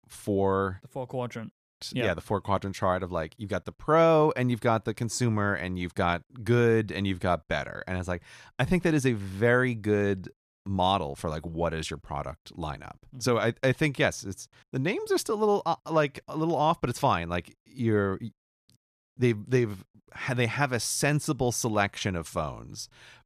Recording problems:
none

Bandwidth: 14.5 kHz